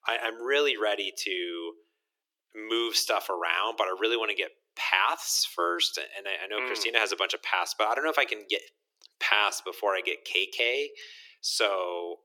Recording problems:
thin; very; fading below 300 Hz

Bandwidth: 17.5 kHz